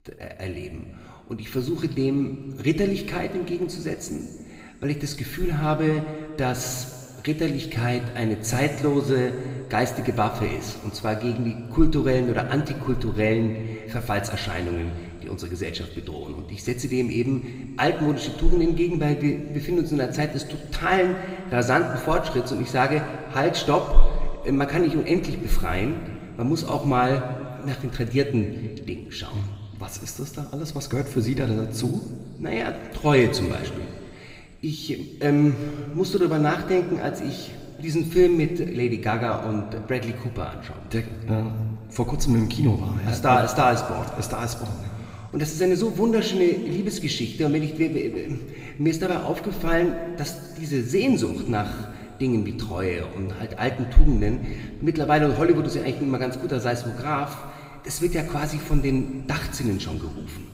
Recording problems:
room echo; slight; dies away in 2.1 s
off-mic speech; somewhat distant

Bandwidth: 15.5 kHz